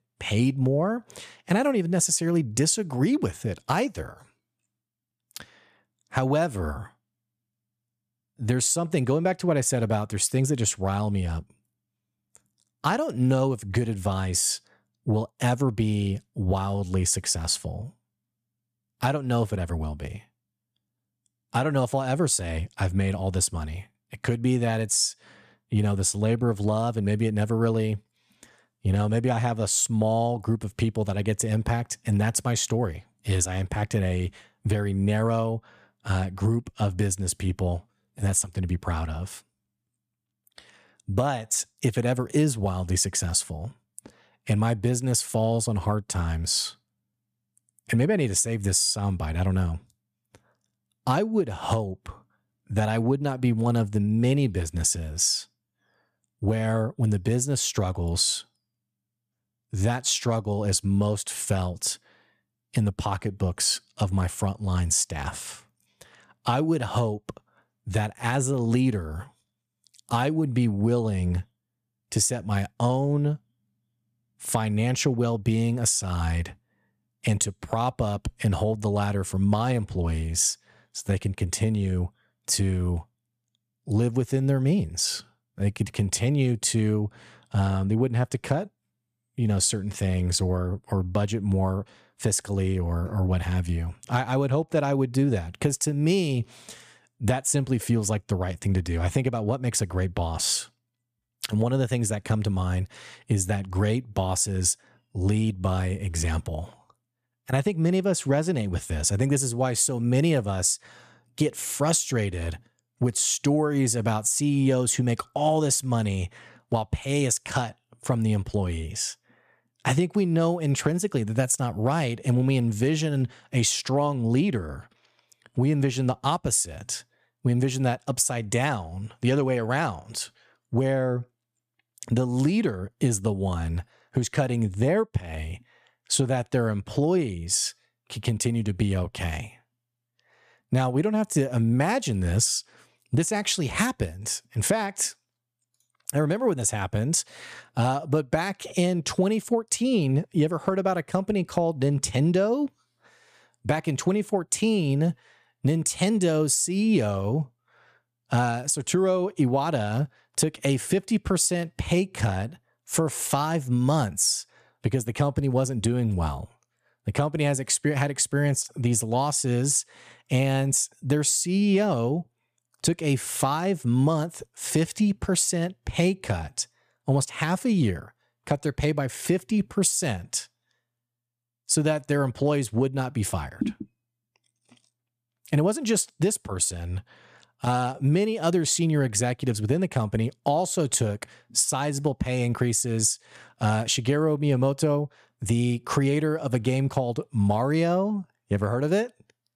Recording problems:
none

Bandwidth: 14.5 kHz